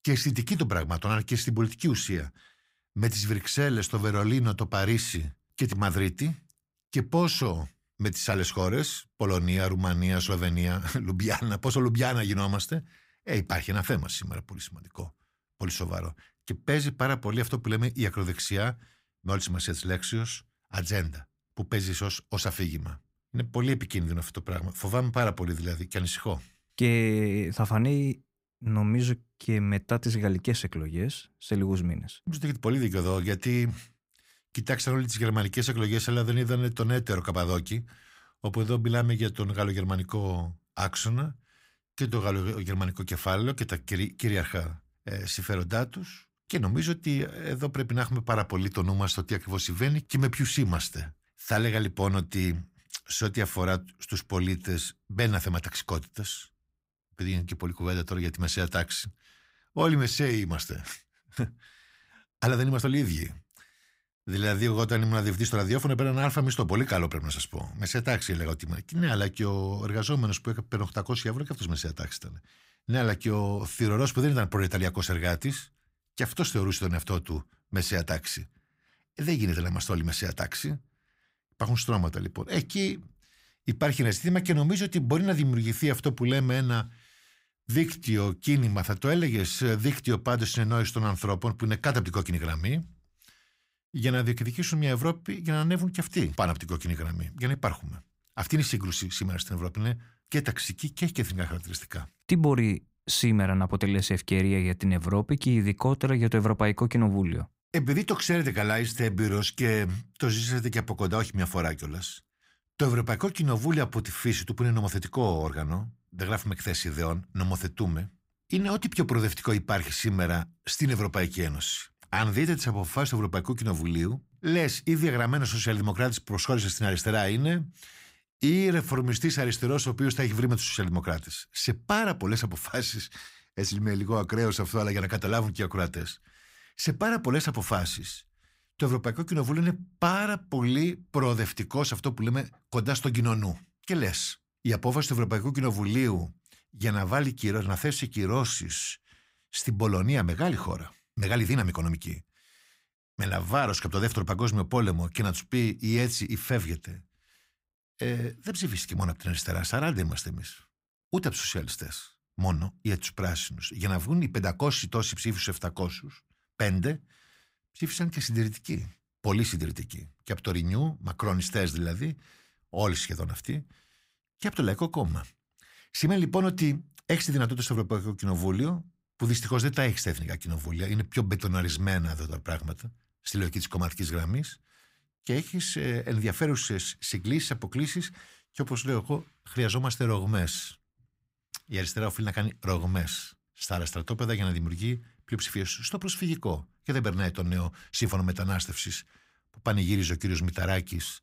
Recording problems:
uneven, jittery; strongly; from 26 s to 3:18

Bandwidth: 15.5 kHz